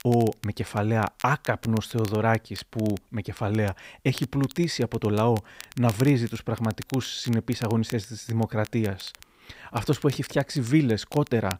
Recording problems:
crackle, like an old record; noticeable; 20 dB below the speech

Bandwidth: 15.5 kHz